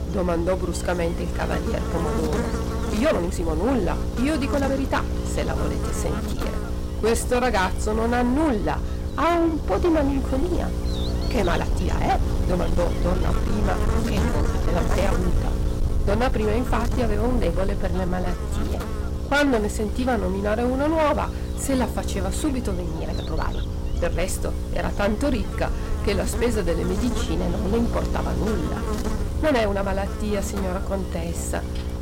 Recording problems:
distortion; slight; 9% of the sound clipped
electrical hum; loud; throughout; 60 Hz, 8 dB below the speech
low rumble; noticeable; throughout; 20 dB below the speech
hiss; faint; throughout; 25 dB below the speech
uneven, jittery; strongly; from 3 to 31 s

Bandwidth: 16 kHz